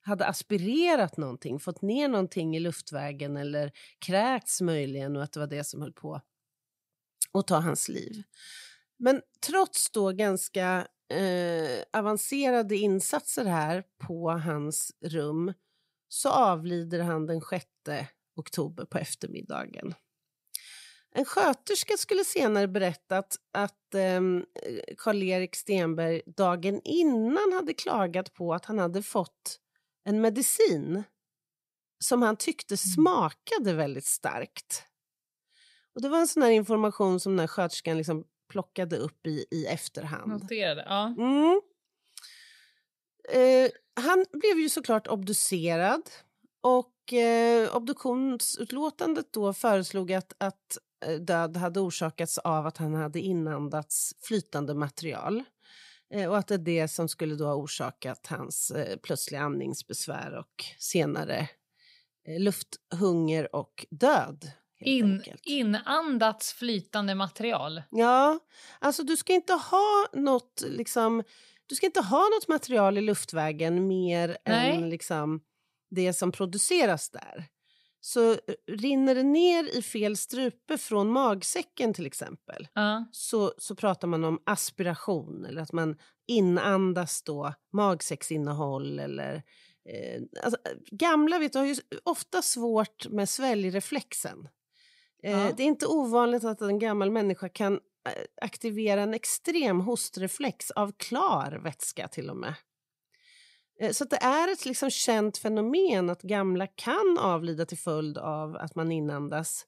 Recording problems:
none

